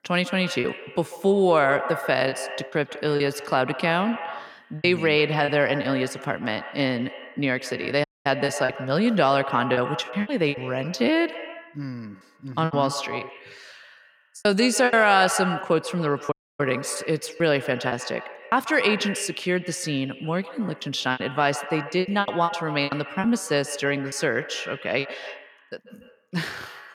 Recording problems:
echo of what is said; strong; throughout; 140 ms later, 10 dB below the speech
choppy; very; 8% of the speech affected
audio cutting out; at 8 s and at 16 s

